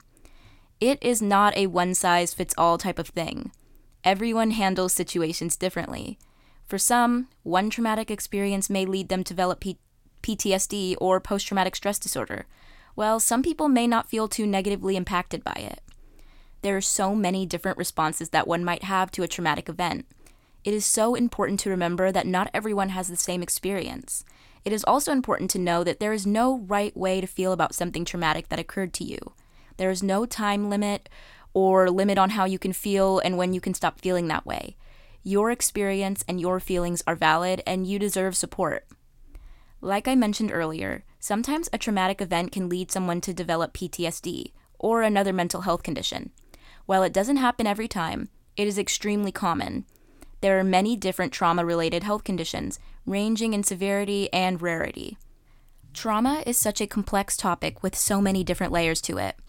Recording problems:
none

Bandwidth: 16.5 kHz